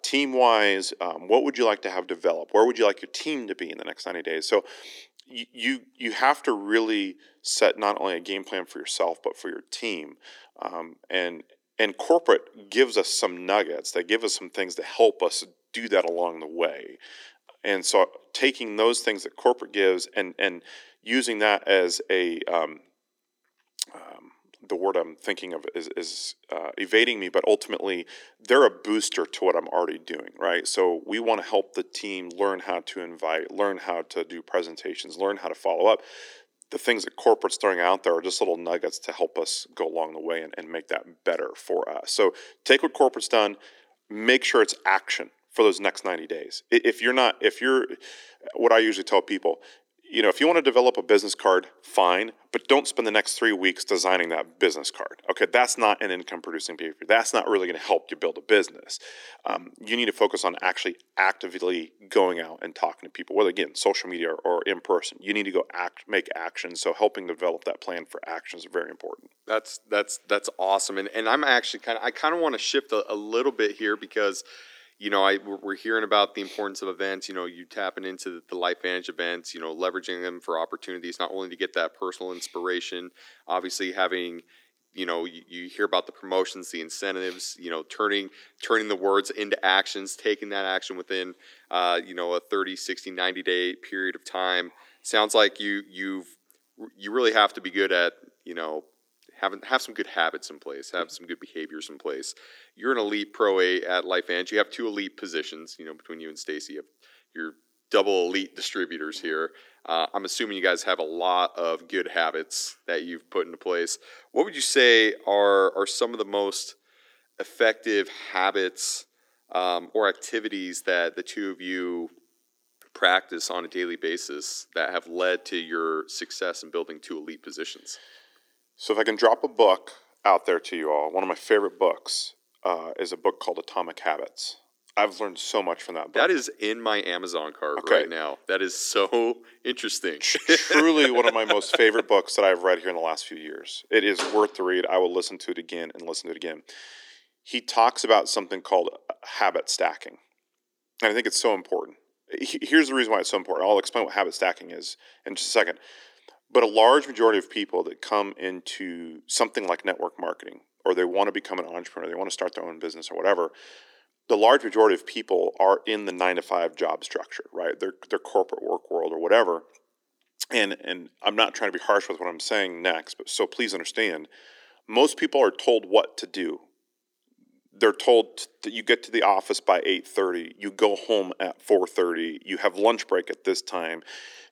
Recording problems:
thin; somewhat; fading below 300 Hz

